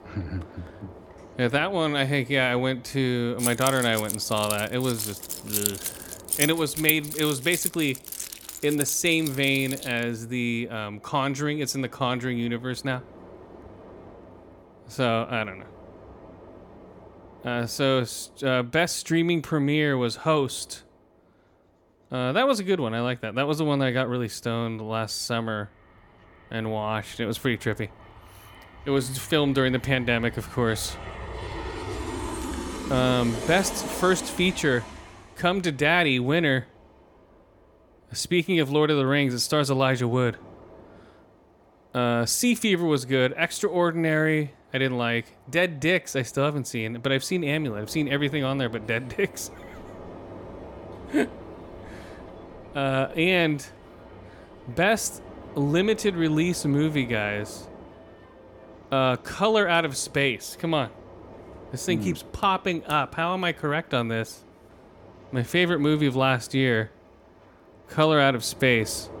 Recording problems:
train or aircraft noise; noticeable; throughout; 15 dB below the speech
jangling keys; noticeable; from 3.5 to 9.5 s; peak level with the speech

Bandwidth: 18 kHz